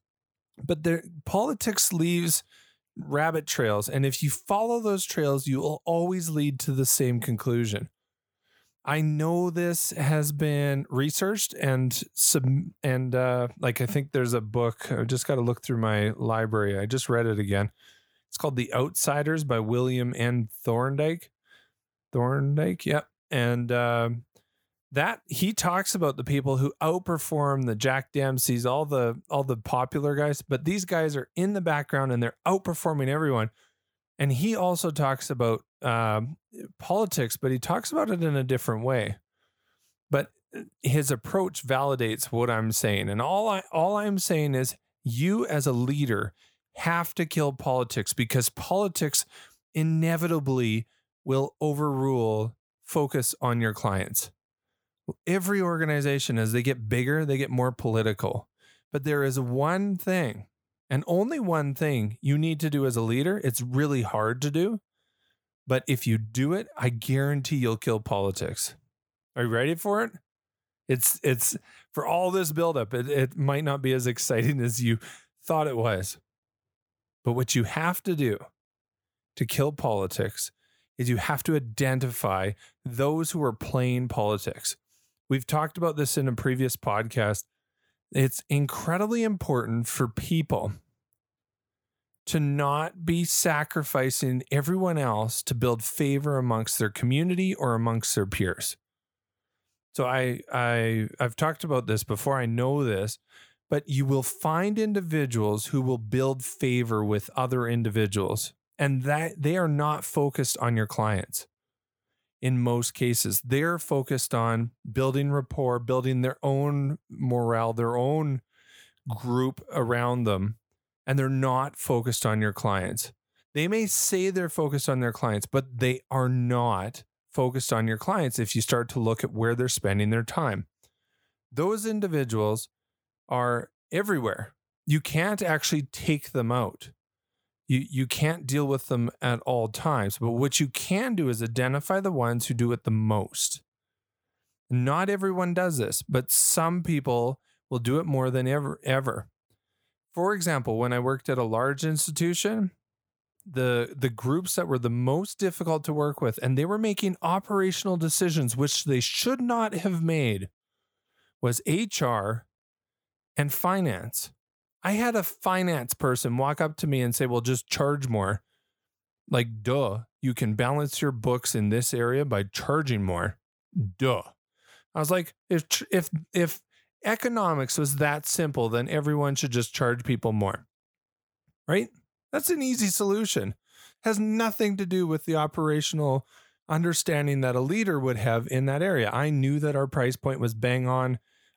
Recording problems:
none

